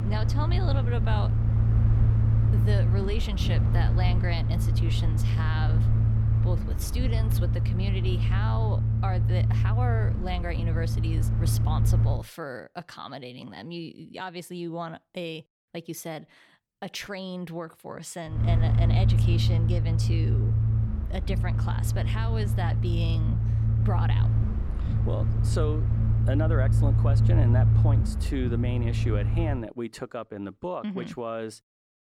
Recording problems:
low rumble; loud; until 12 s and from 18 to 30 s; 2 dB below the speech

